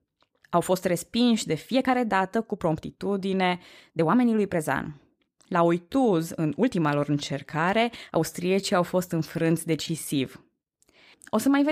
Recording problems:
uneven, jittery; strongly; from 0.5 to 10 s
abrupt cut into speech; at the end

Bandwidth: 15 kHz